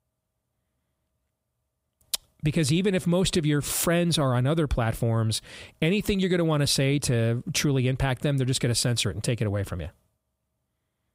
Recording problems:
none

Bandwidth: 15.5 kHz